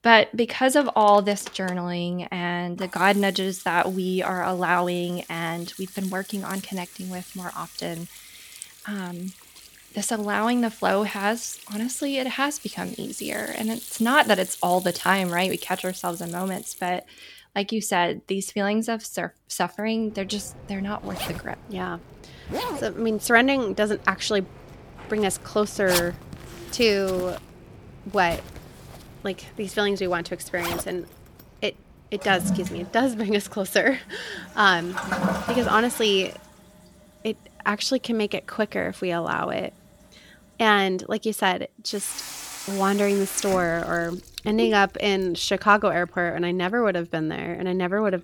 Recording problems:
household noises; noticeable; throughout; 10 dB below the speech

